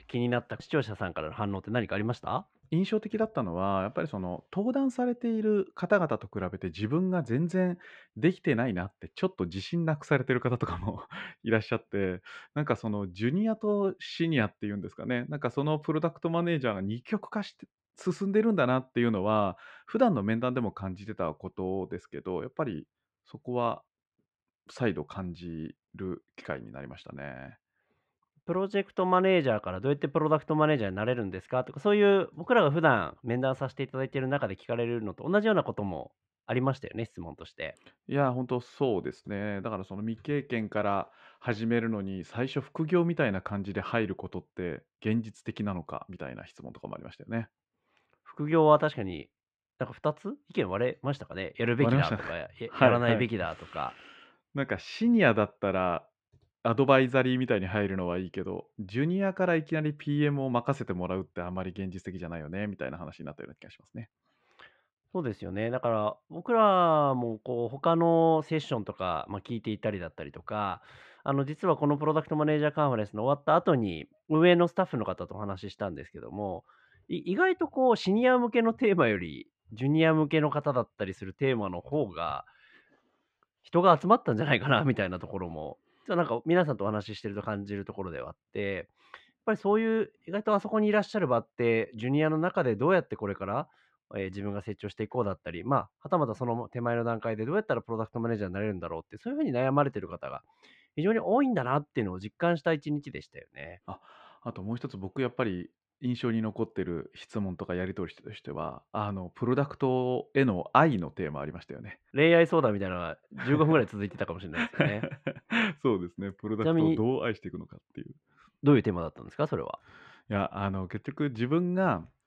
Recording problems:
muffled; slightly; fading above 2.5 kHz

